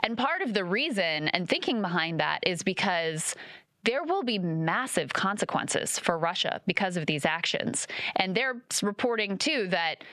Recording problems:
squashed, flat; heavily

